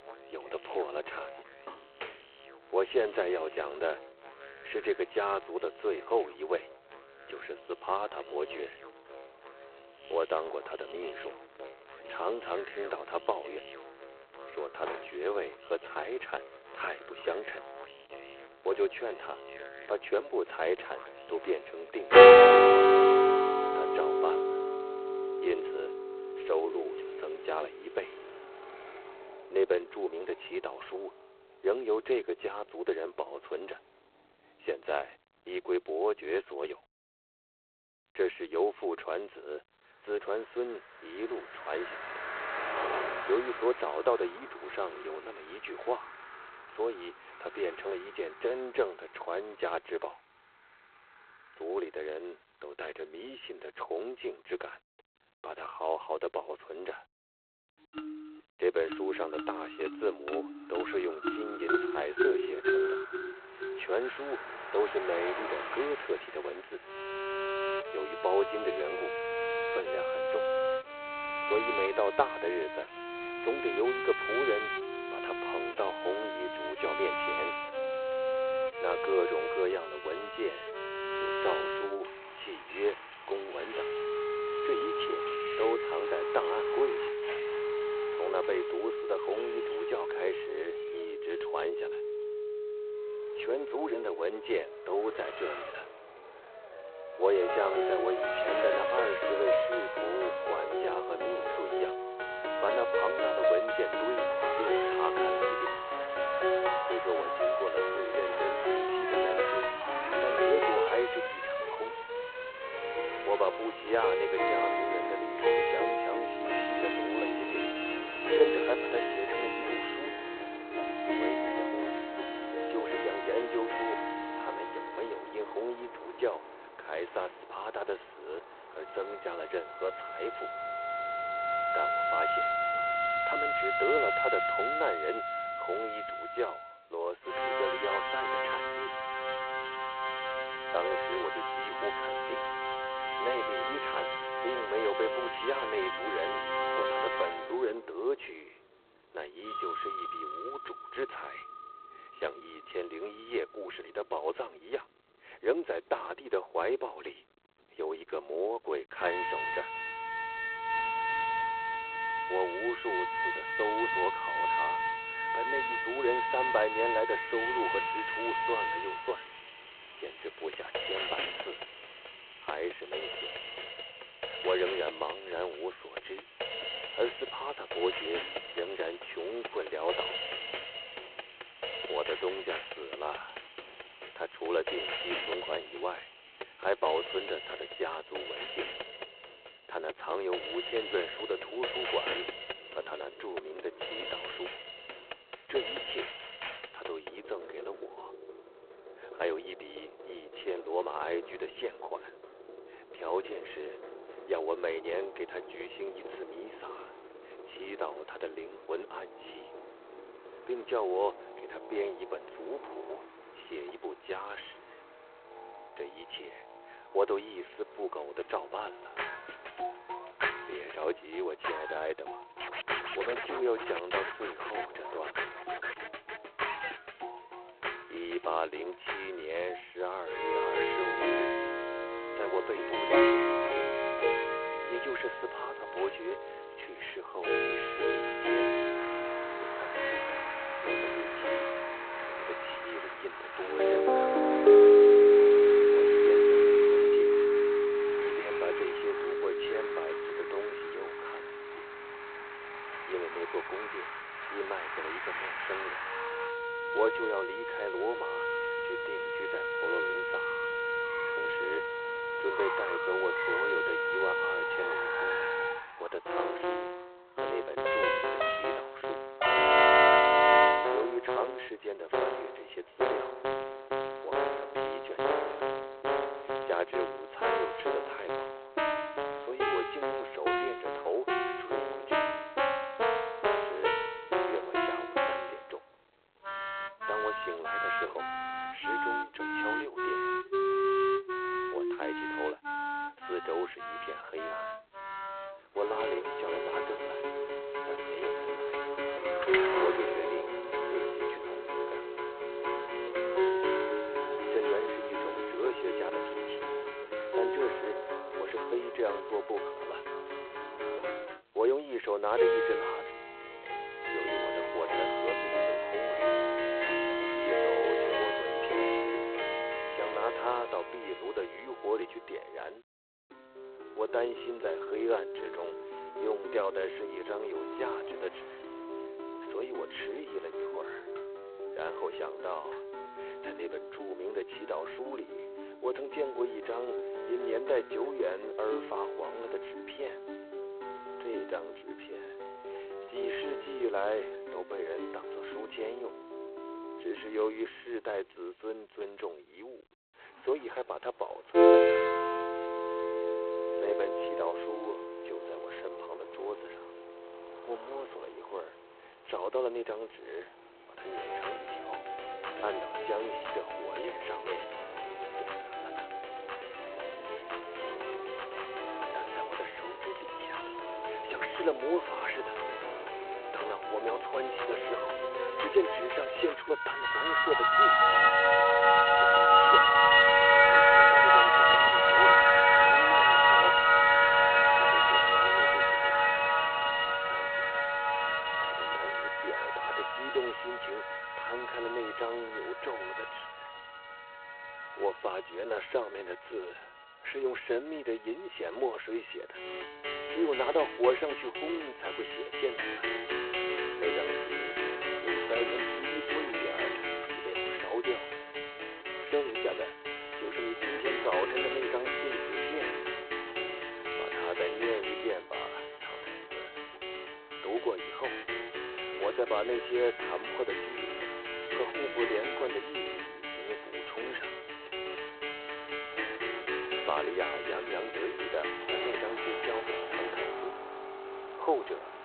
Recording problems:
phone-call audio; poor line
background music; very loud; throughout; 7 dB above the speech
traffic noise; loud; throughout; 6 dB below the speech

